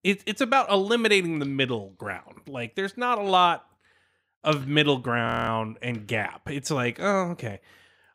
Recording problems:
audio freezing; at 5.5 s

